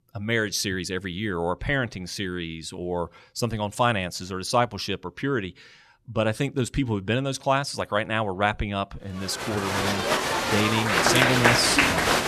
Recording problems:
crowd noise; very loud; from 9.5 s on; 5 dB above the speech

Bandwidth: 13.5 kHz